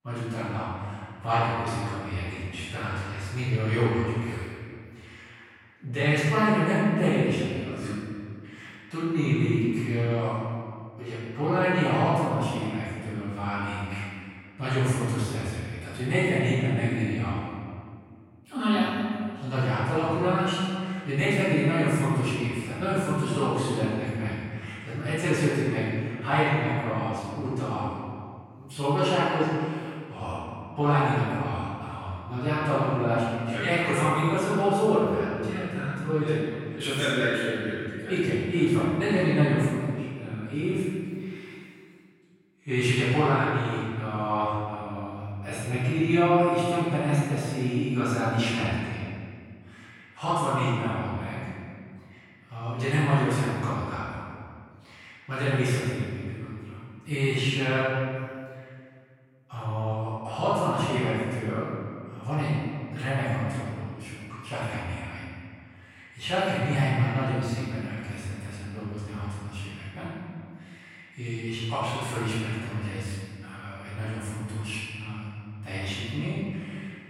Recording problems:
room echo; strong; dies away in 1.9 s
off-mic speech; far

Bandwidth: 16 kHz